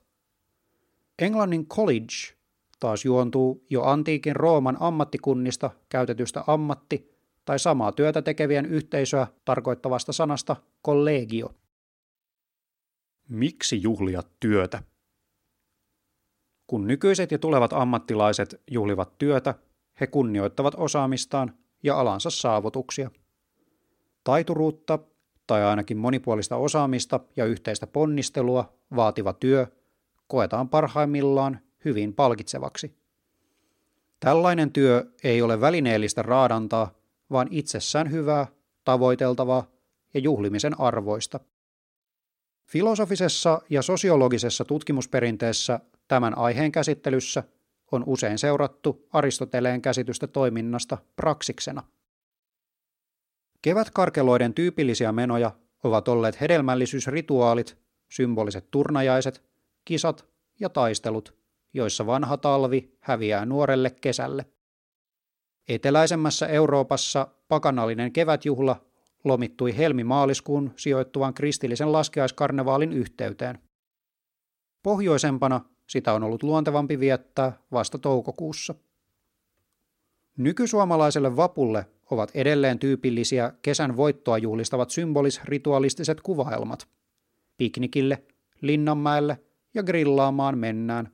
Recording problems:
none

